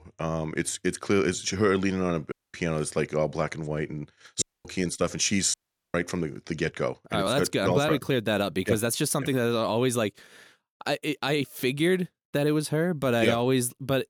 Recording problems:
audio cutting out; at 2.5 s, at 4.5 s and at 5.5 s

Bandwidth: 17.5 kHz